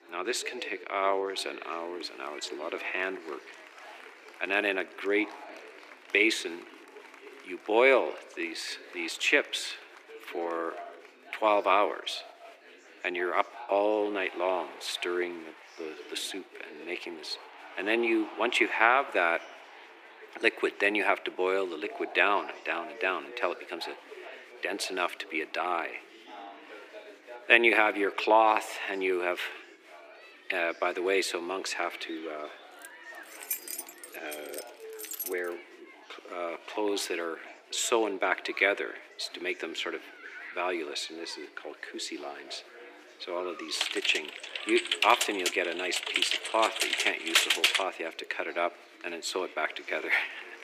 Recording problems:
thin; very; fading below 350 Hz
chatter from many people; noticeable; throughout; 20 dB below the speech
jangling keys; noticeable; from 33 to 35 s; peak 4 dB below the speech
keyboard typing; loud; from 44 to 48 s; peak 7 dB above the speech

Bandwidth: 15 kHz